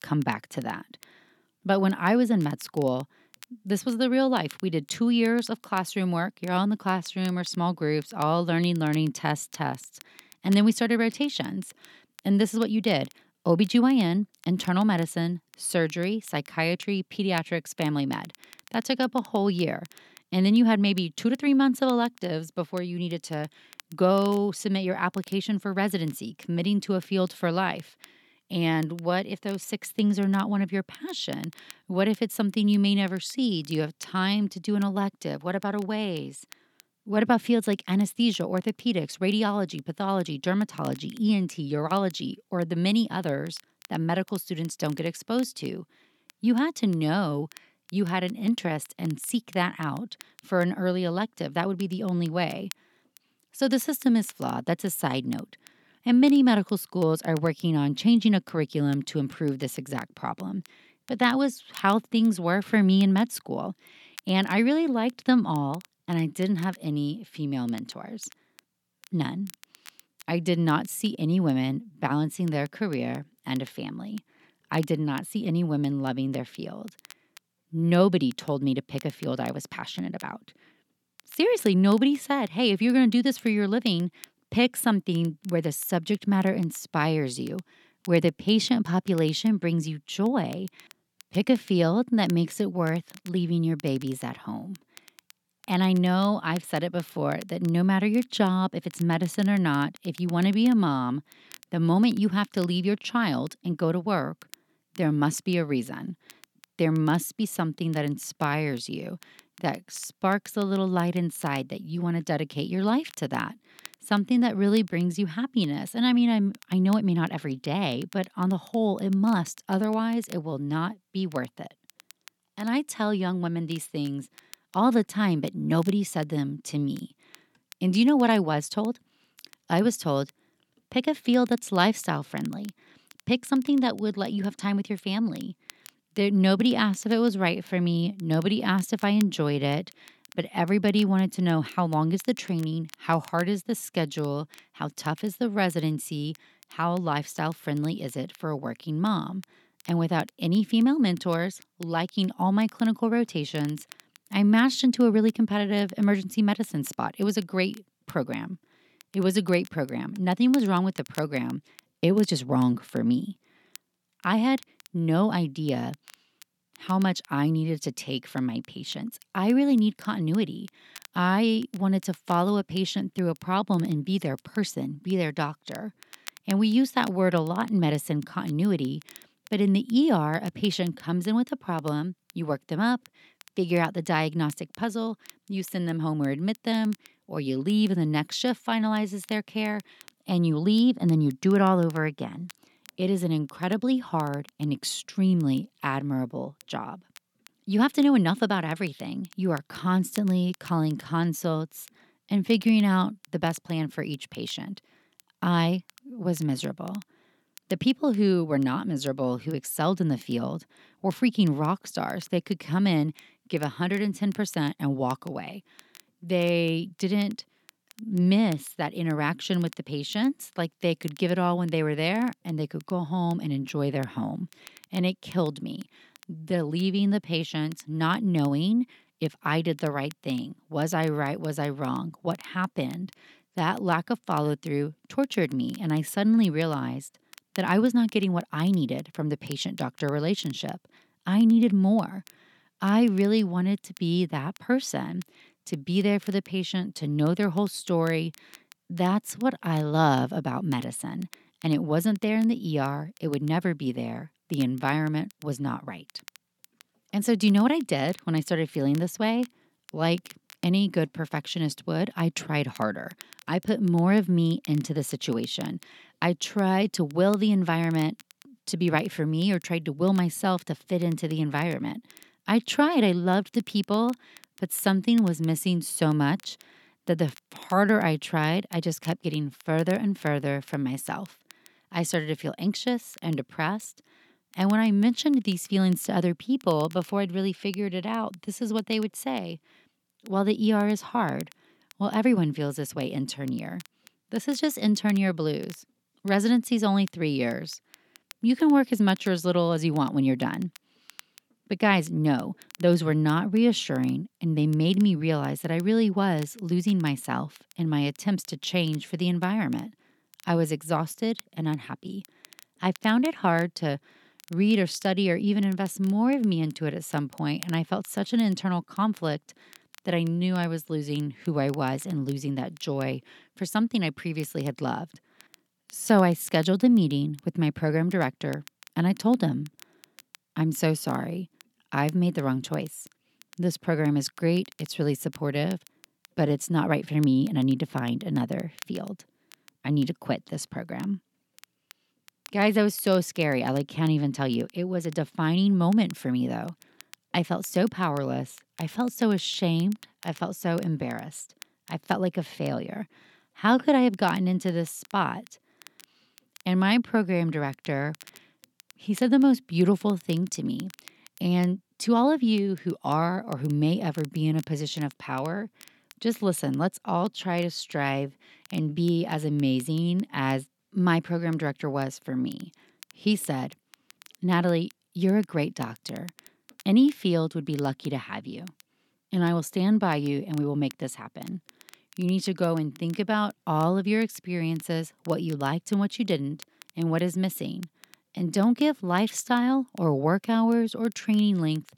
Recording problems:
crackle, like an old record; faint; 25 dB below the speech

